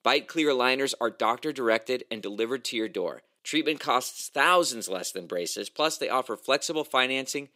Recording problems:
thin; somewhat; fading below 450 Hz

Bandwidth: 15.5 kHz